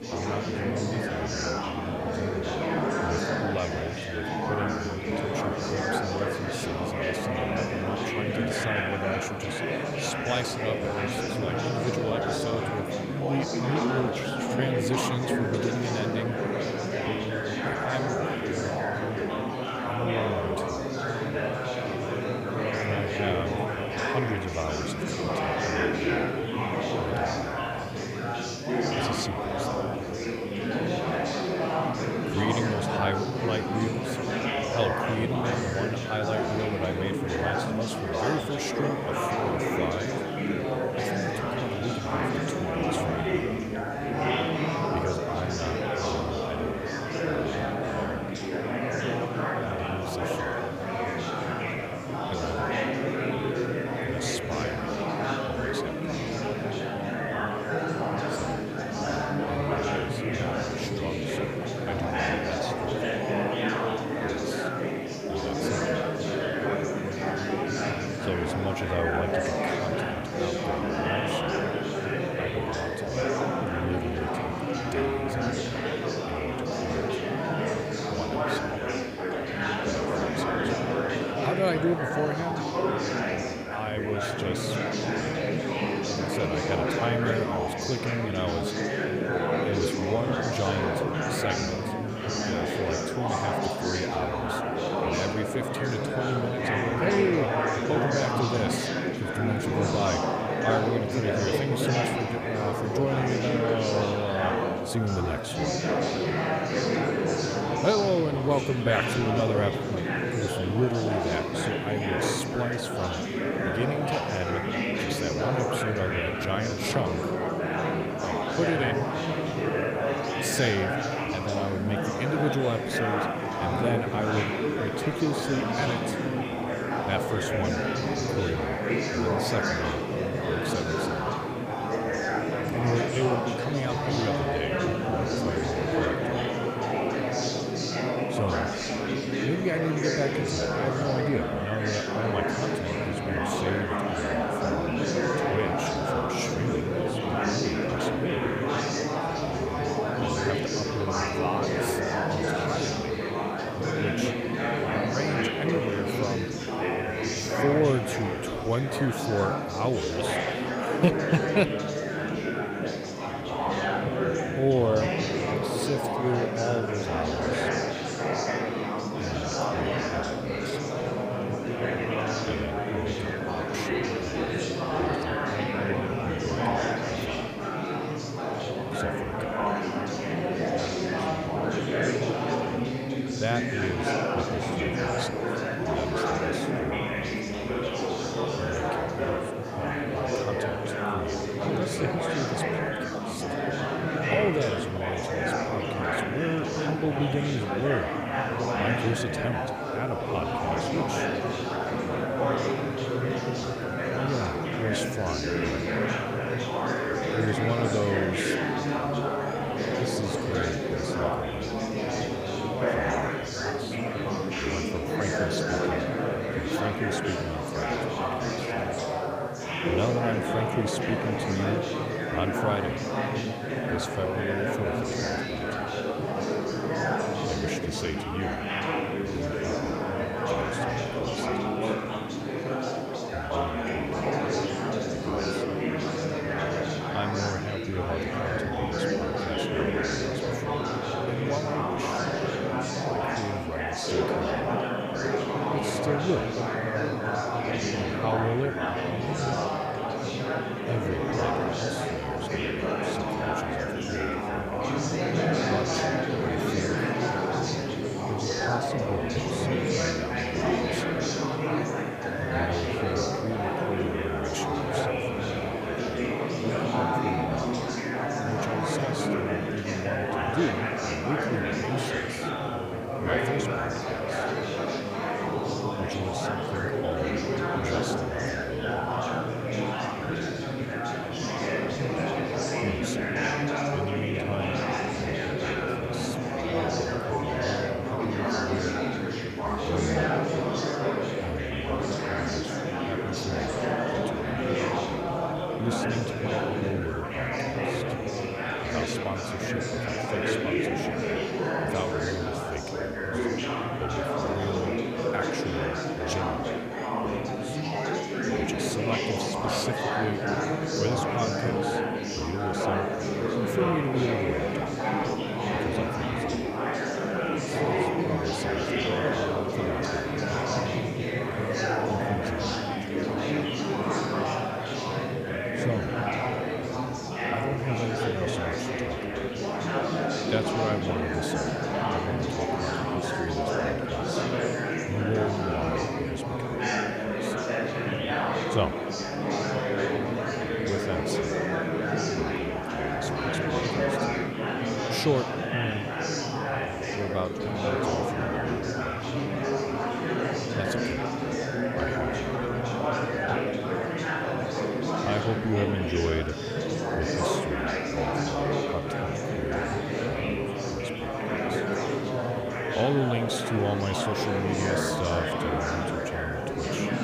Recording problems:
chatter from many people; very loud; throughout; 5 dB above the speech
hiss; faint; throughout; 25 dB below the speech

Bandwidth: 15 kHz